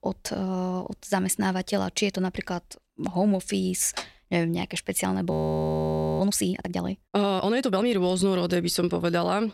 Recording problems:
audio freezing; at 5.5 s for 1 s

